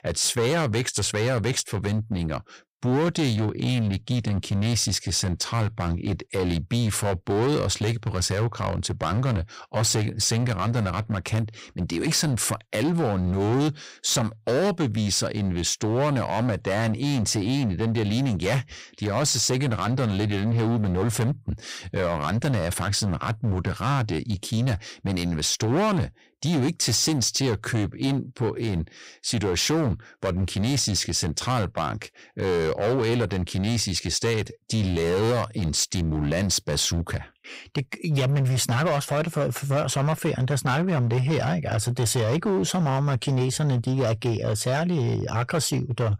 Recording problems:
distortion; slight; 16% of the sound clipped

